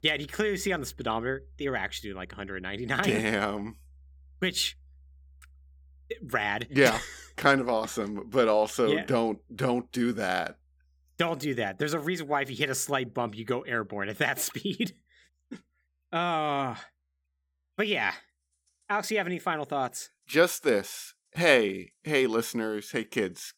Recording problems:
background music; faint; throughout; 30 dB below the speech

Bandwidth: 18.5 kHz